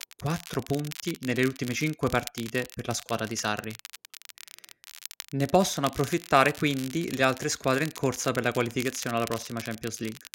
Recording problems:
crackle, like an old record; noticeable; 15 dB below the speech

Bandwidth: 16 kHz